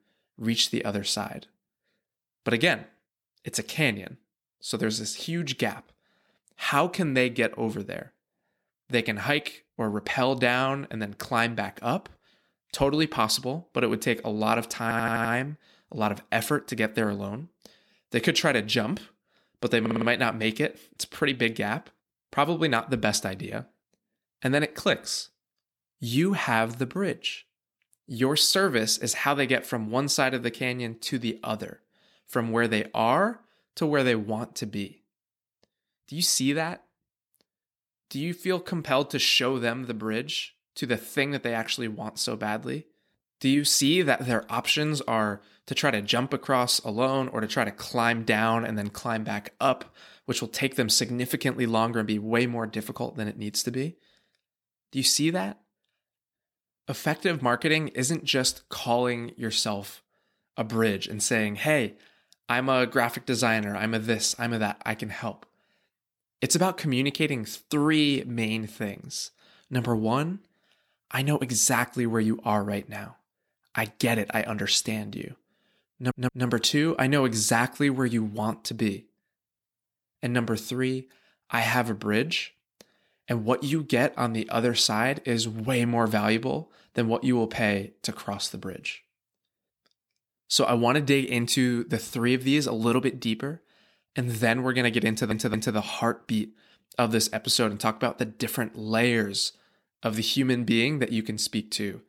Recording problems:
audio stuttering; 4 times, first at 15 s

